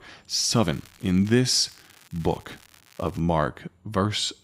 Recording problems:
crackling; faint; at 0.5 s and from 1.5 to 3 s; 25 dB below the speech

